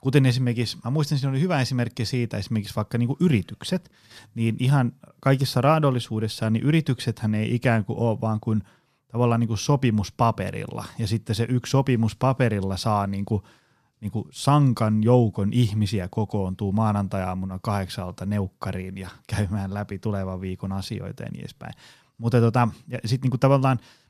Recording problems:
none

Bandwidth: 14.5 kHz